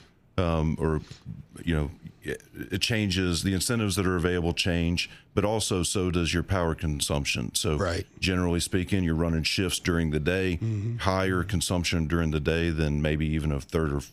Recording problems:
squashed, flat; somewhat

